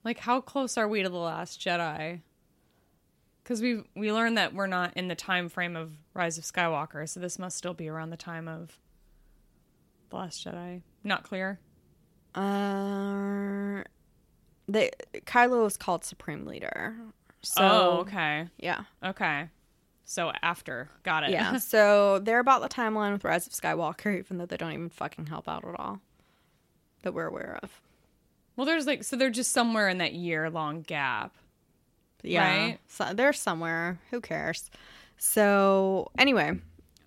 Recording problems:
none

